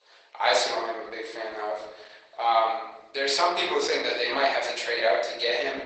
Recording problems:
off-mic speech; far
garbled, watery; badly; nothing above 8 kHz
thin; very; fading below 500 Hz
room echo; noticeable; dies away in 0.7 s

